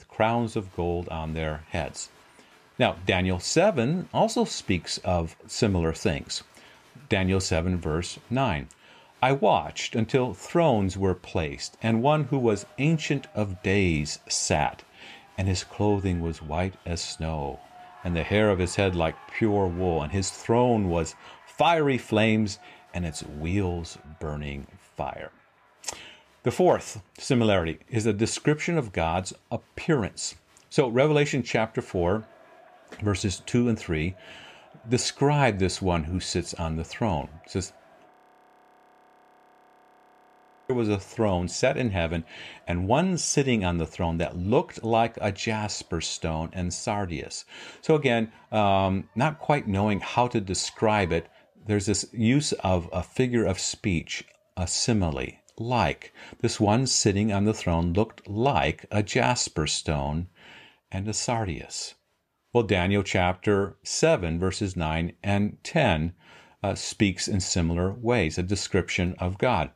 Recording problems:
crowd noise; faint; throughout; 30 dB below the speech
audio freezing; at 38 s for 2.5 s

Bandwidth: 14.5 kHz